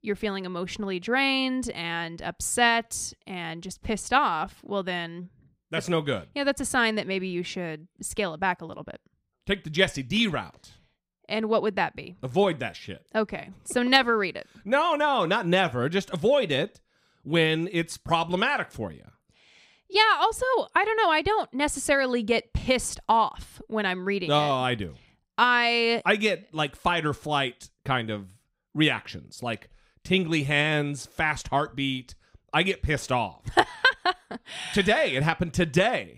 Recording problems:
none

